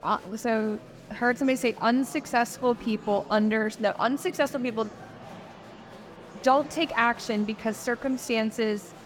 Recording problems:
murmuring crowd; noticeable; throughout; 20 dB below the speech

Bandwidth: 17.5 kHz